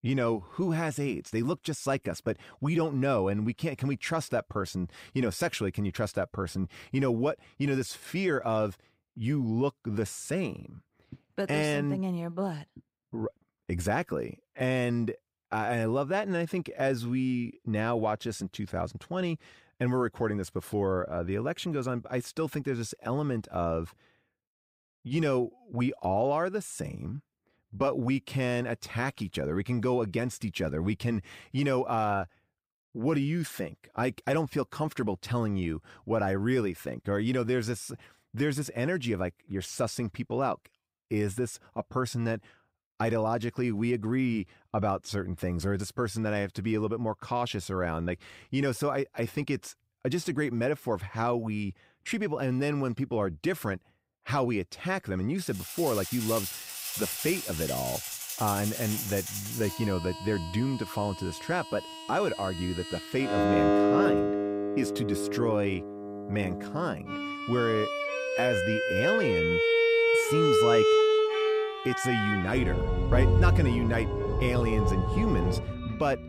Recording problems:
background music; very loud; from 56 s on; 3 dB above the speech

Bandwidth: 15.5 kHz